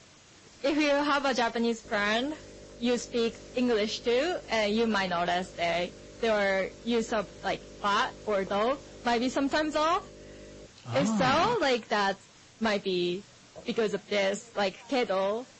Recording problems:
distortion; slight; 7% of the sound clipped
garbled, watery; slightly; nothing above 8 kHz
electrical hum; faint; from 2 to 11 s; 50 Hz, 25 dB below the speech
hiss; faint; throughout; 25 dB below the speech

